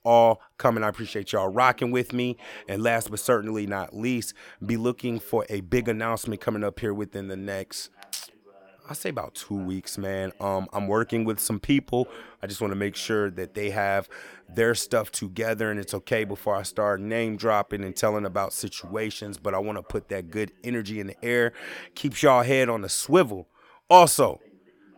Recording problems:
voice in the background; faint; throughout; 30 dB below the speech

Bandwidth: 17 kHz